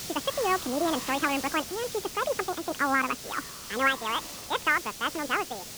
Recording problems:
high frequencies cut off; severe; nothing above 4 kHz
wrong speed and pitch; too fast and too high; 1.7 times normal speed
hiss; loud; throughout; 8 dB below the speech

